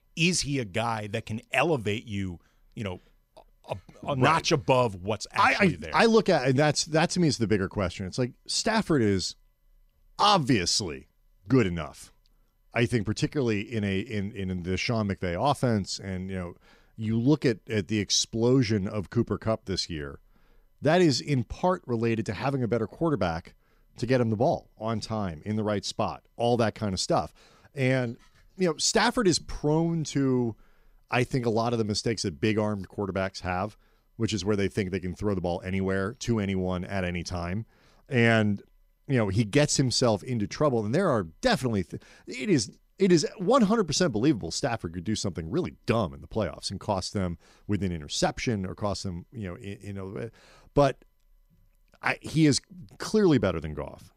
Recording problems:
none

